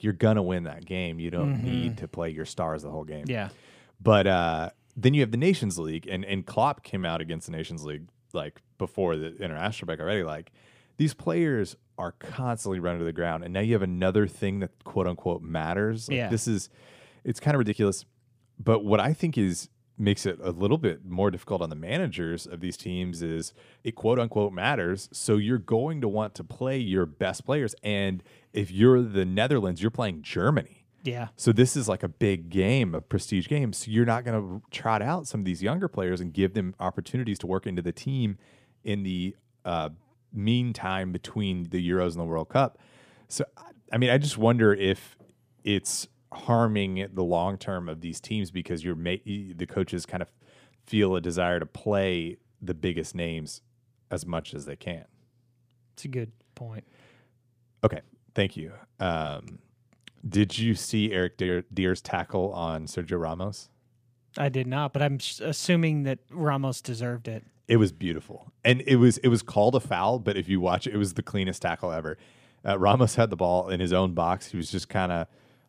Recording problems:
uneven, jittery; strongly; from 1 s to 1:15

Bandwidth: 15 kHz